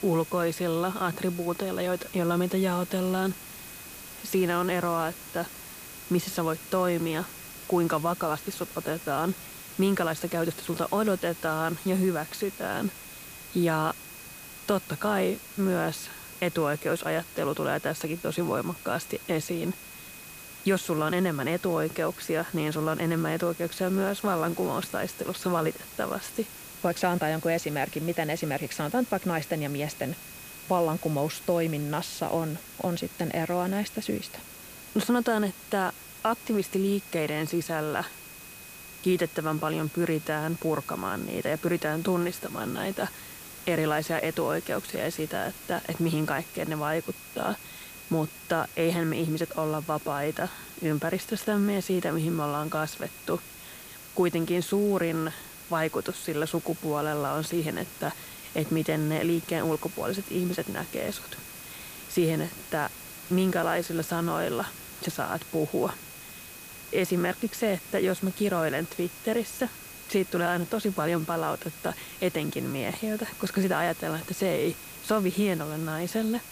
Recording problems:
hiss; noticeable; throughout; 15 dB below the speech
high-pitched whine; faint; throughout; 2.5 kHz, 20 dB below the speech

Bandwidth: 15 kHz